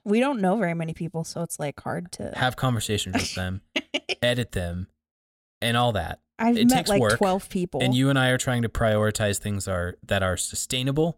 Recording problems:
none

